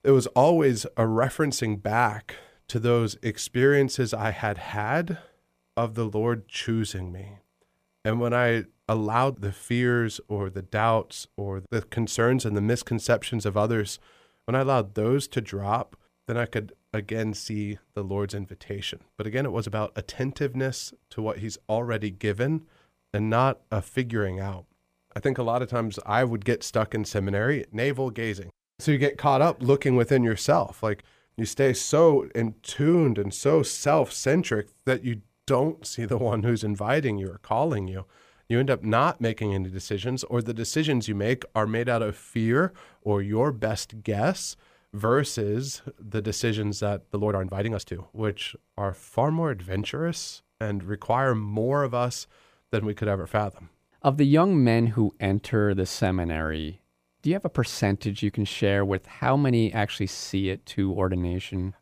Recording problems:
uneven, jittery; strongly; from 8 to 49 s

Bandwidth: 15 kHz